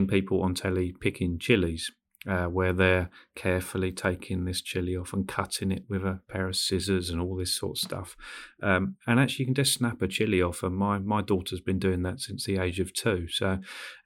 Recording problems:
abrupt cut into speech; at the start

